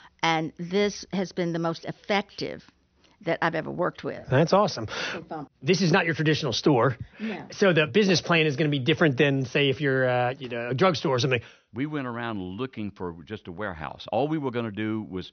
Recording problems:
high frequencies cut off; noticeable; nothing above 6 kHz

